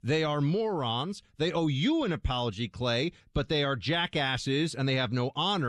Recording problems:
abrupt cut into speech; at the end

